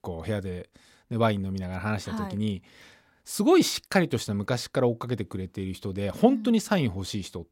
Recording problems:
none

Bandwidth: 16.5 kHz